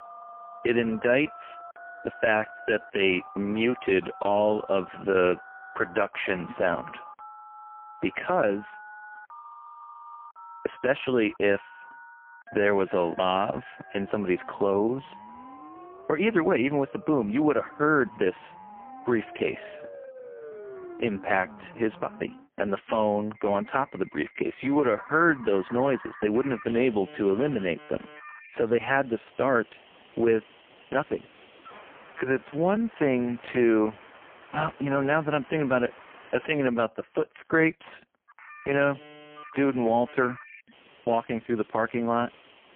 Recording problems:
phone-call audio; poor line
alarms or sirens; noticeable; throughout; 20 dB below the speech
uneven, jittery; strongly; from 2 to 38 s

